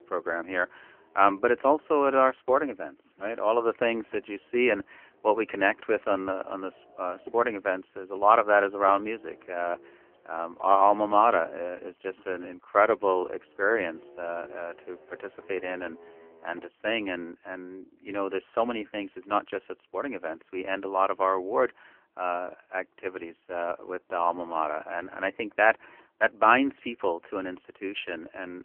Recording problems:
phone-call audio; poor line; nothing above 3 kHz
traffic noise; faint; until 17 s; 25 dB below the speech

